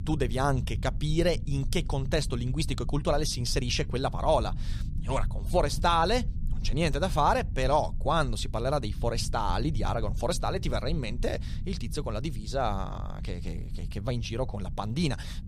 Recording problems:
low rumble; faint; throughout; 20 dB below the speech

